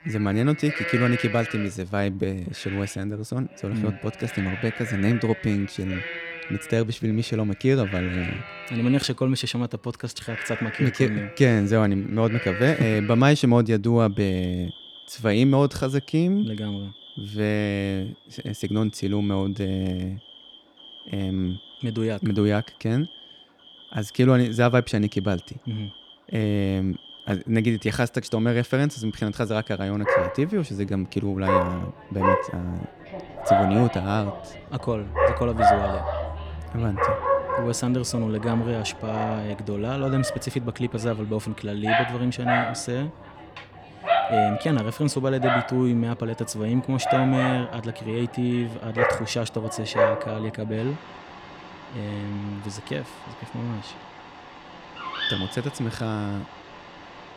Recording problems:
animal sounds; loud; throughout; 3 dB below the speech

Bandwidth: 17 kHz